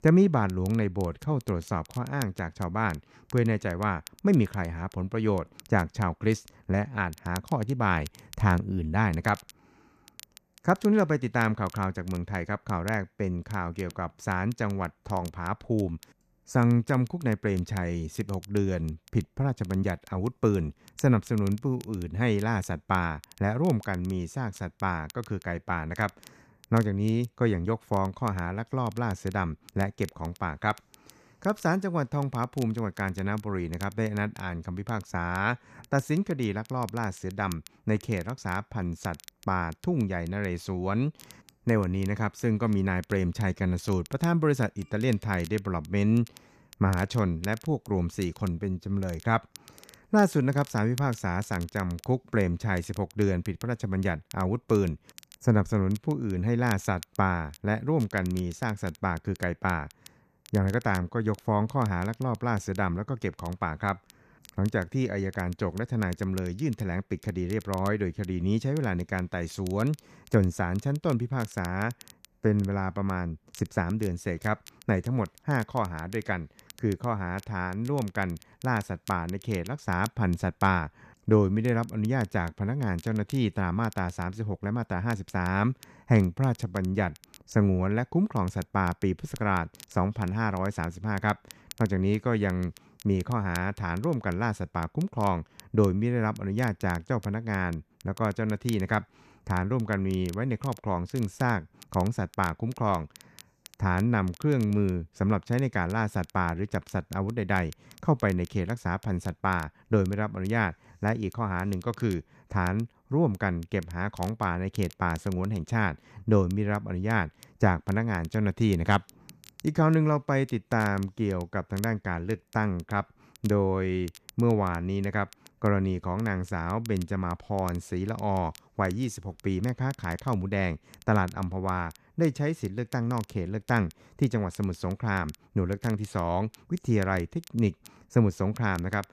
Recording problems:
crackle, like an old record; faint; 25 dB below the speech

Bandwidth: 14.5 kHz